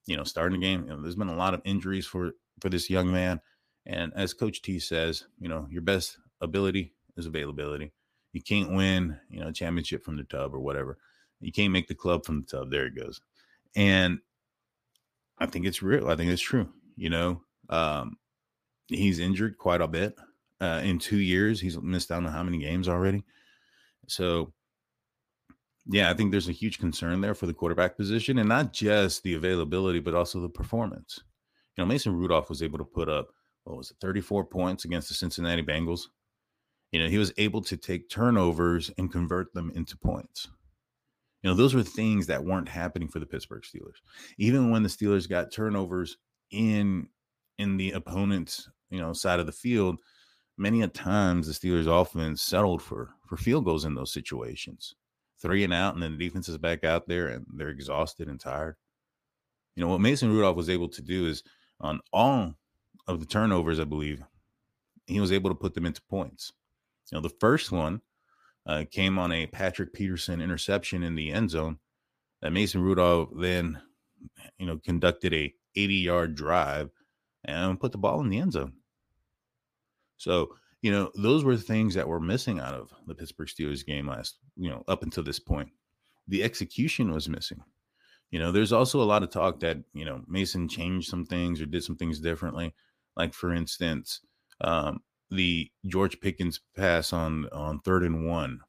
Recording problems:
none

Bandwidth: 15 kHz